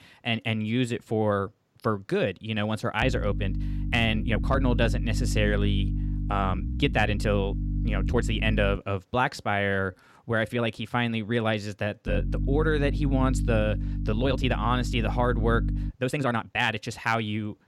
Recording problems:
electrical hum; noticeable; from 3 to 9 s and from 12 to 16 s; 50 Hz, 15 dB below the speech
uneven, jittery; strongly; from 1.5 to 17 s

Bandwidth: 18 kHz